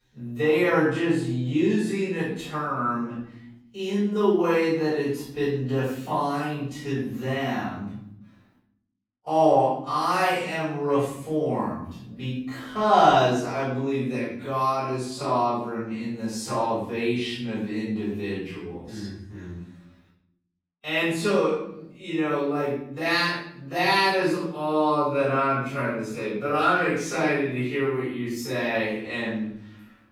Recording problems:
off-mic speech; far
wrong speed, natural pitch; too slow; 0.5 times normal speed
room echo; noticeable; dies away in 0.7 s

